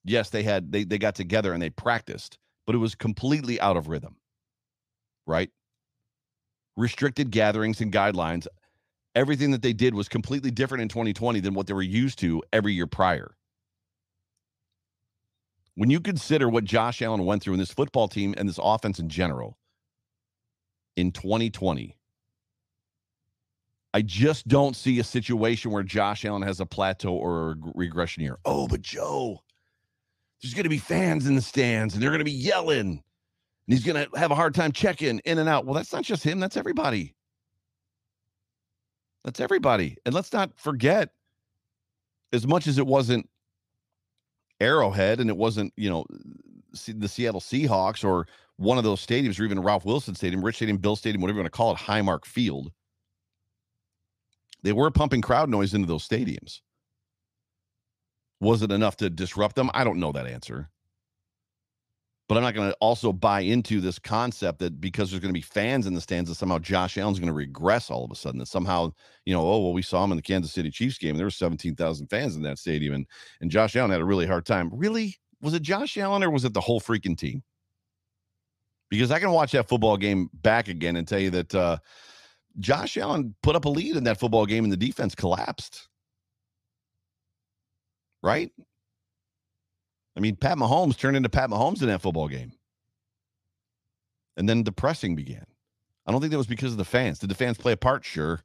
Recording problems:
none

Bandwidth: 15 kHz